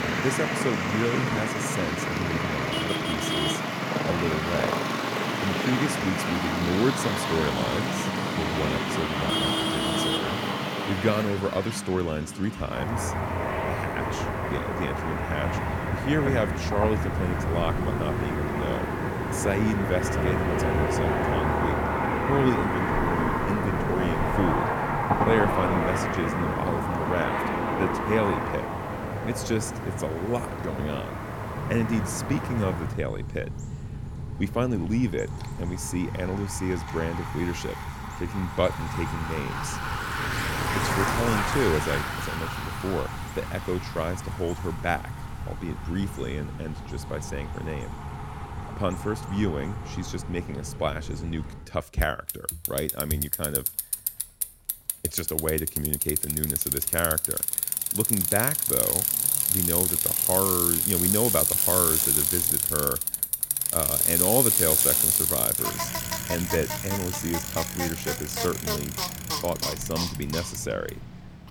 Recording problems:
traffic noise; very loud; throughout; 4 dB above the speech

